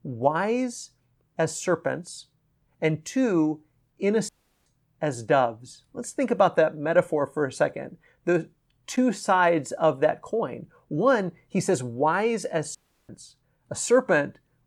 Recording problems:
audio cutting out; at 4.5 s and at 13 s

